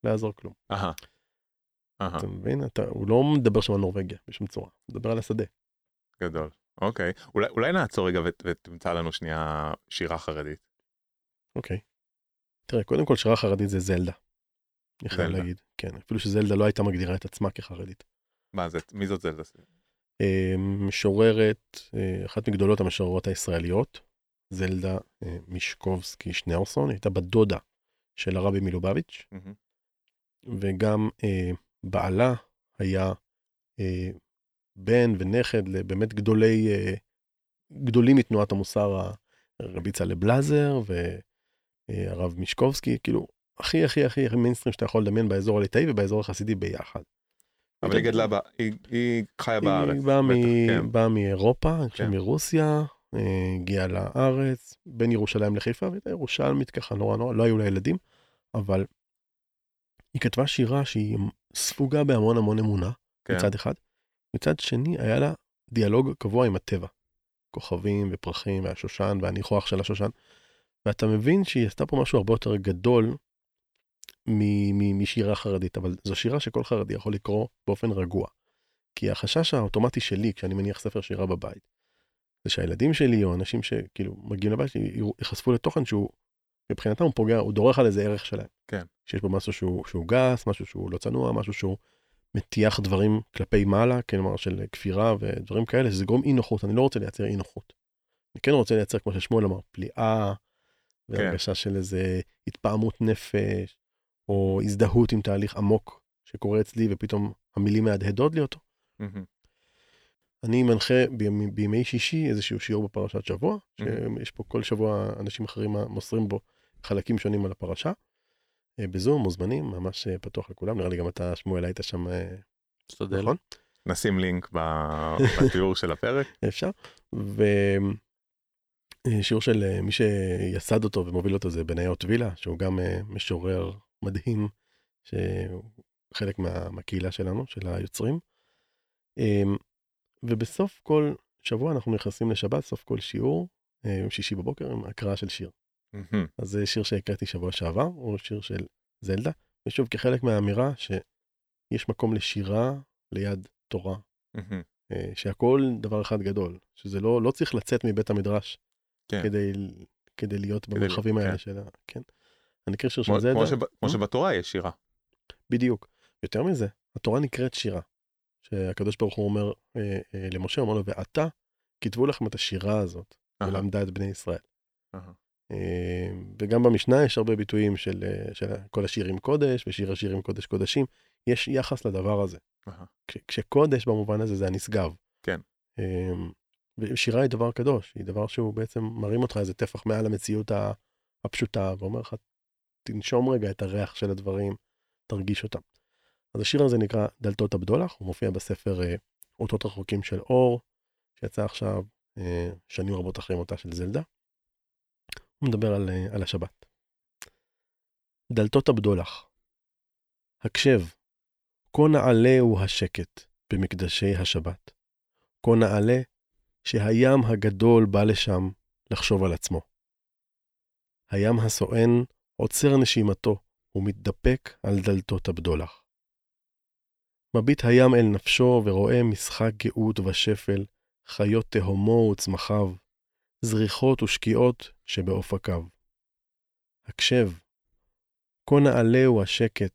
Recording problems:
none

